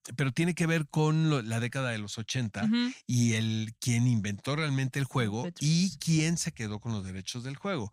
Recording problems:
none

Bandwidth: 15.5 kHz